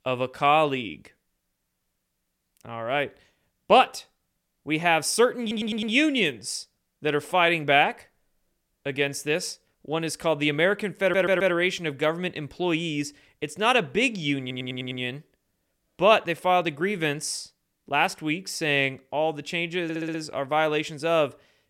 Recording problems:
audio stuttering; 4 times, first at 5.5 s

